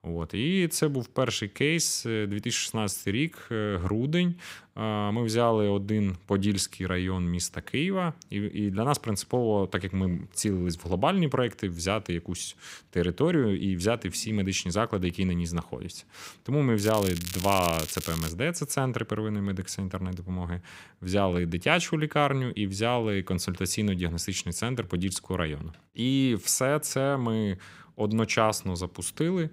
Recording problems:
crackling; loud; from 17 to 18 s; 8 dB below the speech

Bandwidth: 15.5 kHz